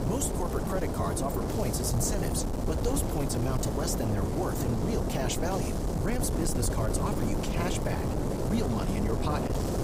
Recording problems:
wind noise on the microphone; heavy; as loud as the speech

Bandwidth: 15.5 kHz